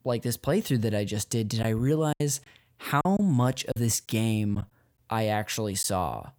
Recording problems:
choppy; occasionally; 4% of the speech affected

